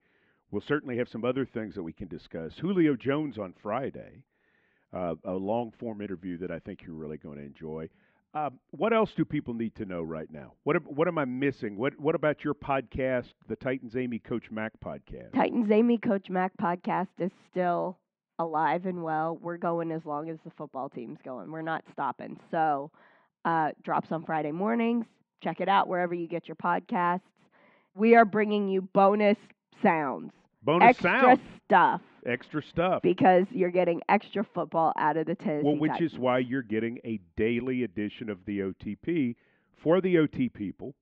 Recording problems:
muffled; very; fading above 3 kHz

